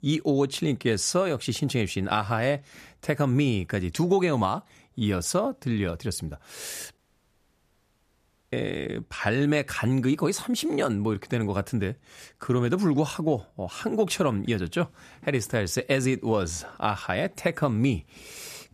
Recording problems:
audio cutting out; at 7 s for 1.5 s

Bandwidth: 14.5 kHz